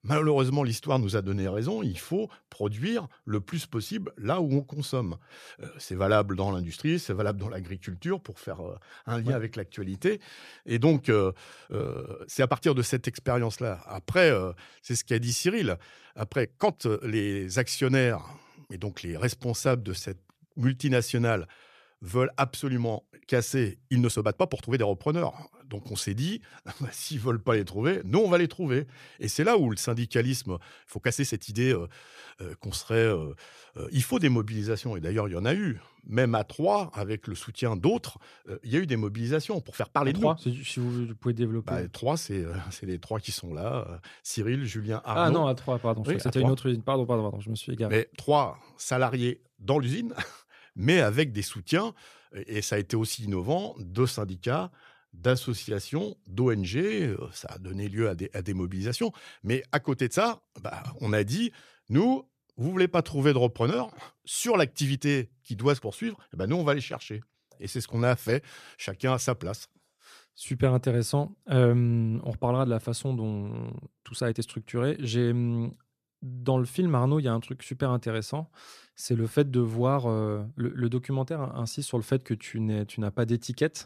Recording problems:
uneven, jittery; strongly; from 12 s to 1:17

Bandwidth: 14.5 kHz